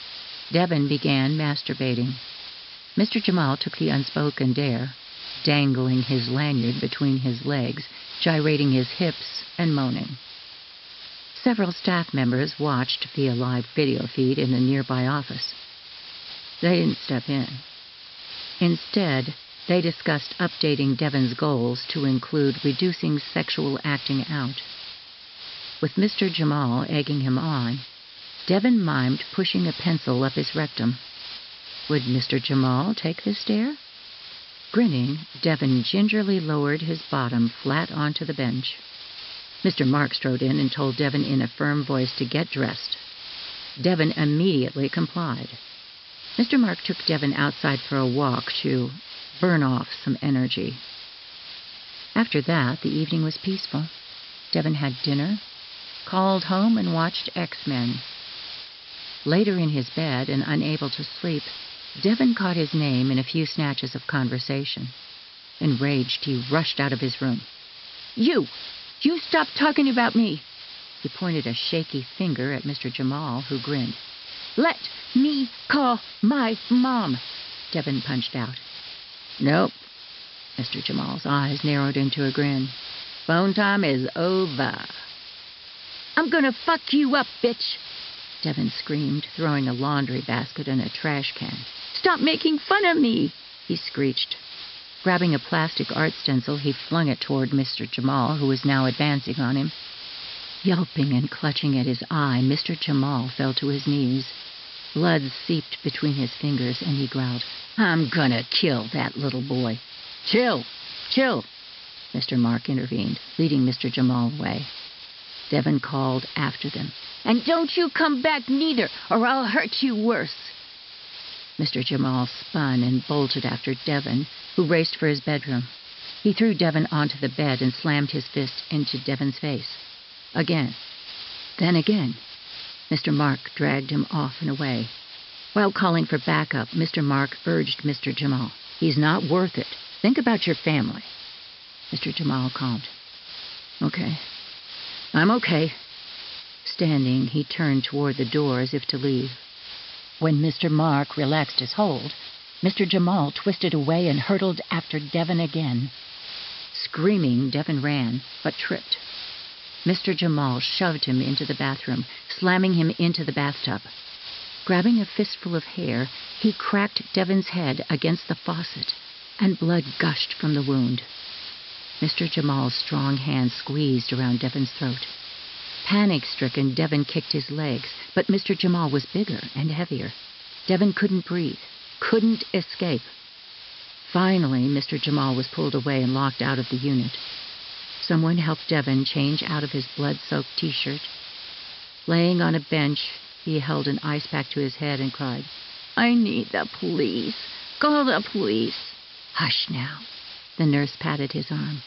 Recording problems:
high frequencies cut off; noticeable; nothing above 5.5 kHz
hiss; noticeable; throughout; 10 dB below the speech

